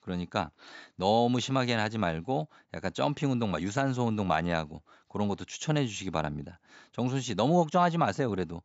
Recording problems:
high frequencies cut off; noticeable; nothing above 8 kHz

